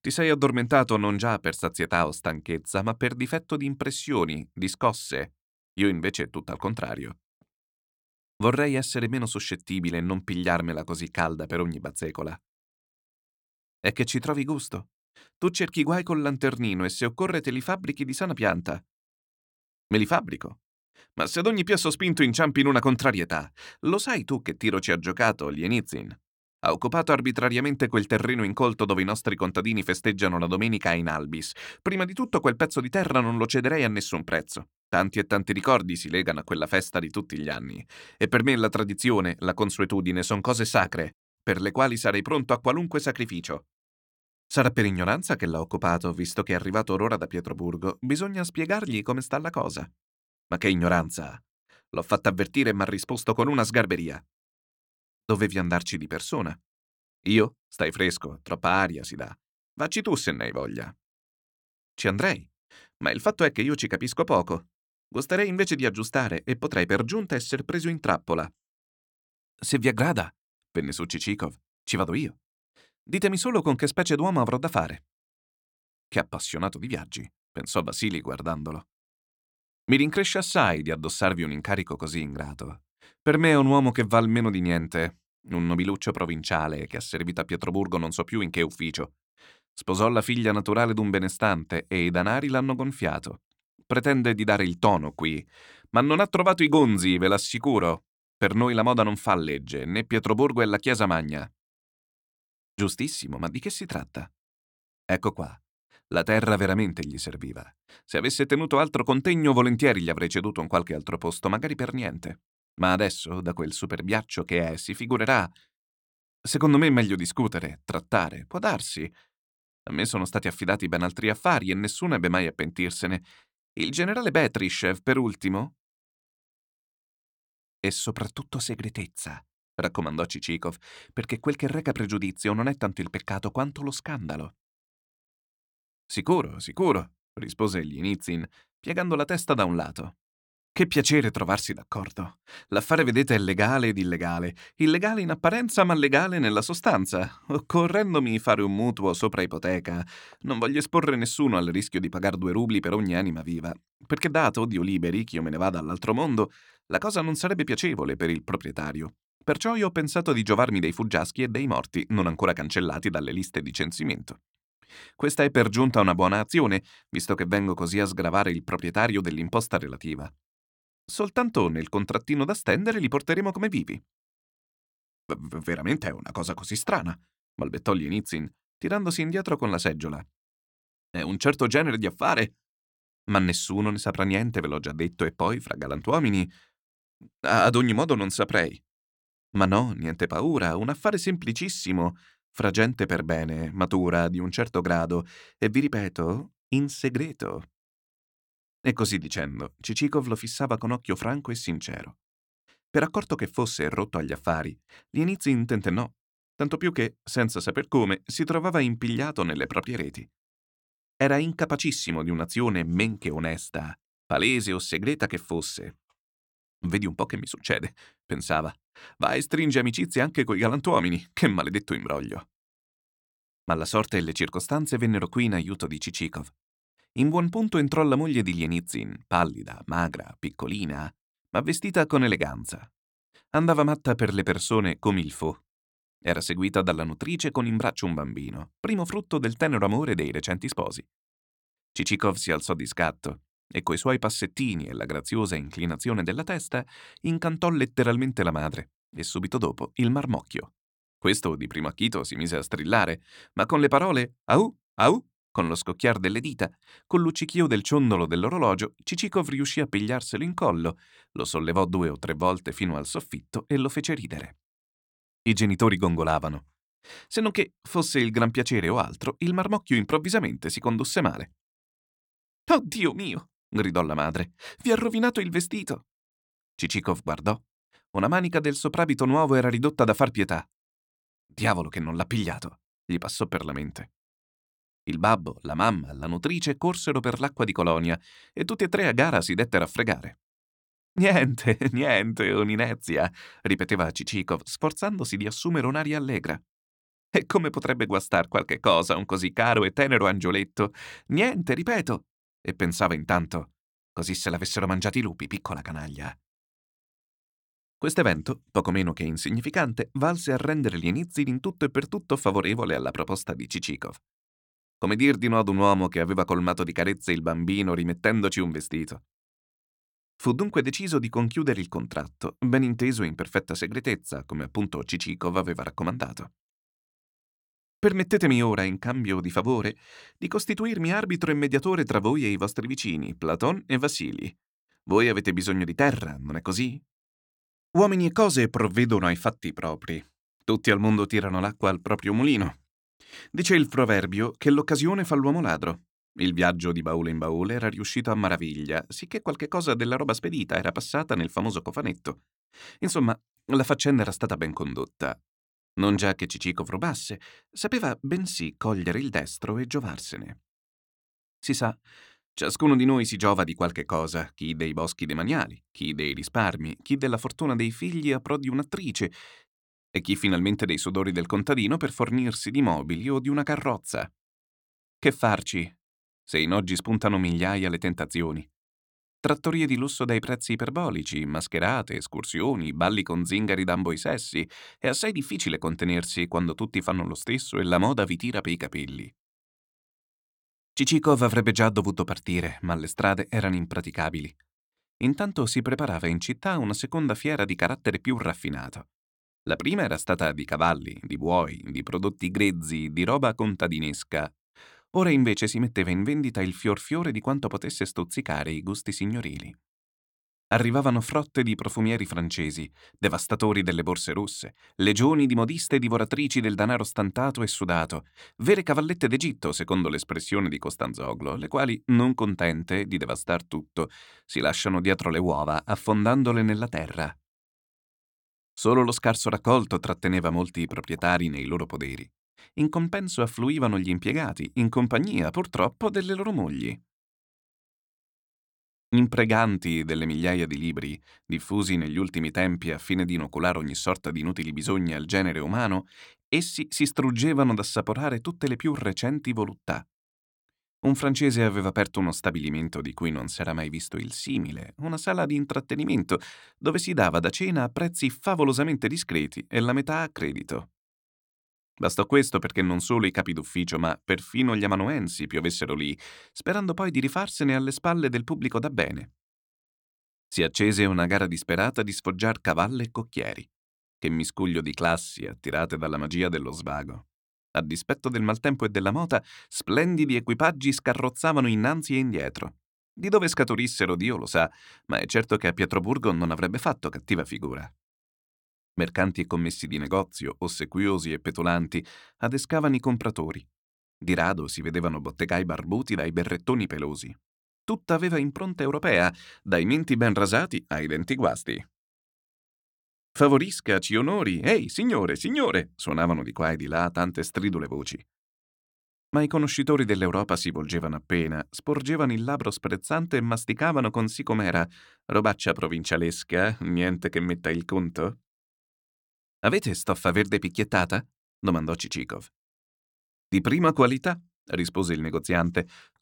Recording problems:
none

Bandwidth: 17 kHz